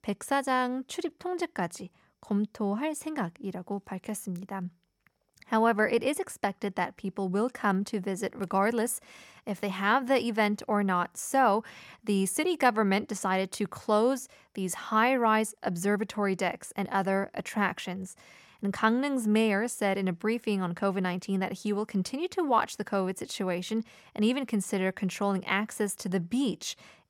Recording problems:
none

